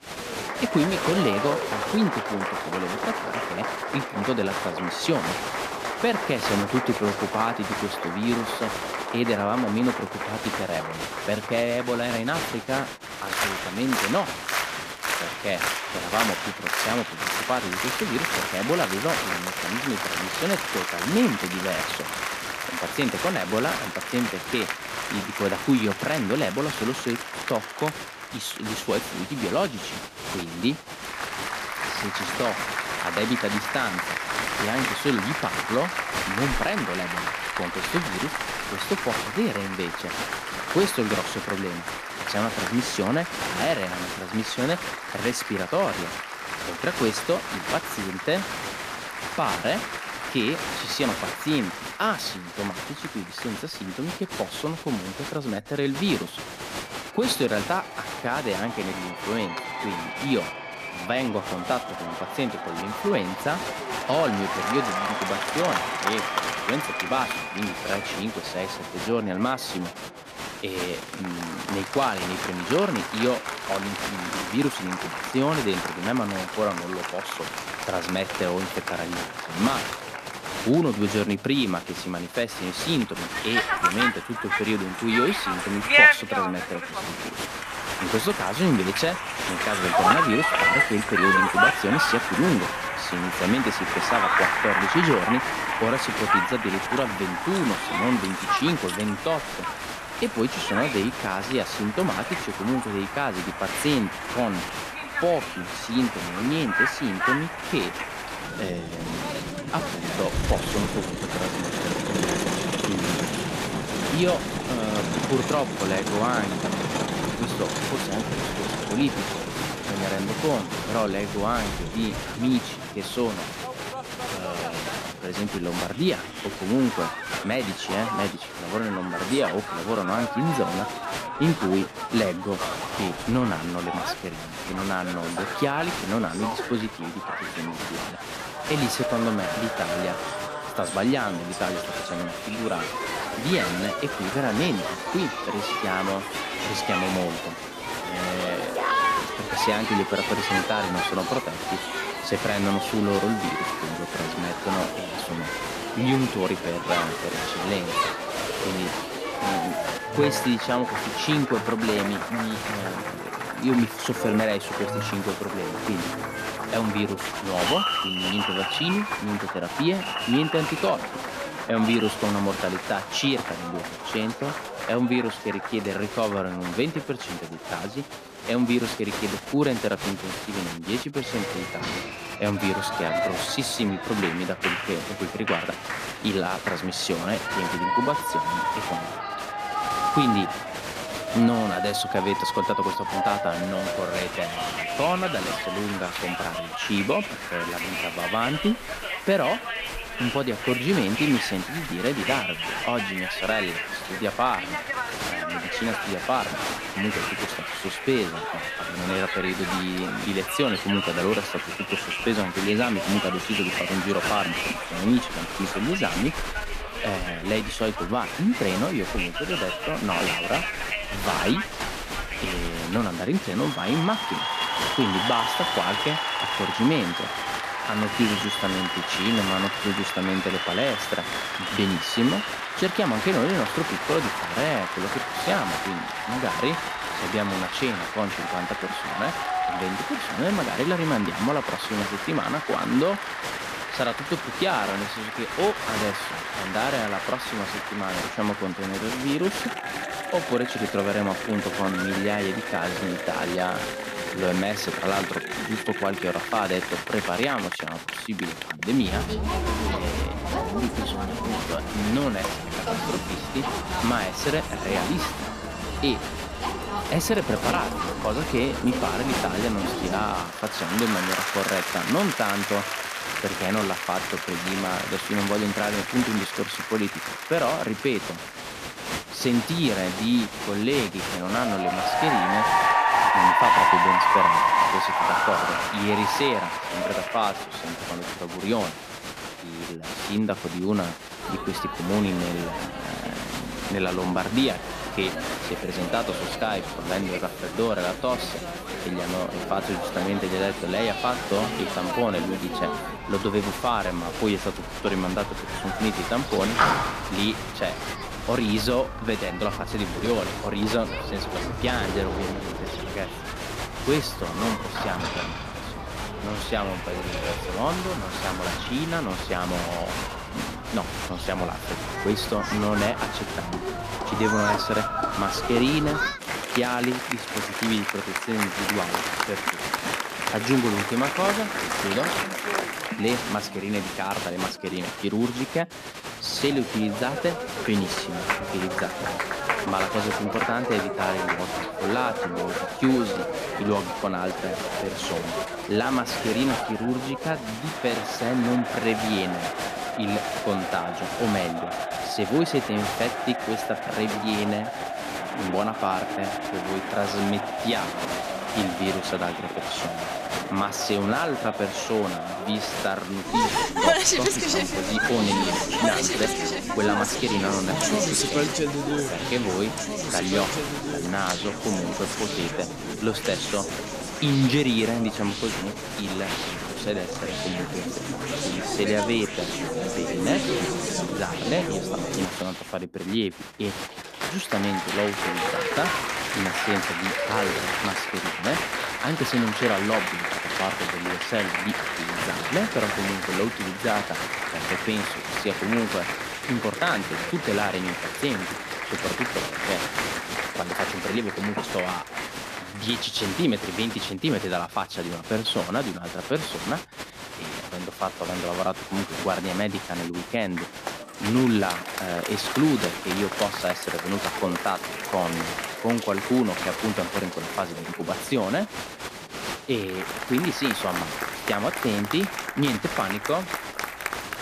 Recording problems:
crowd noise; loud; throughout; as loud as the speech

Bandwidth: 14.5 kHz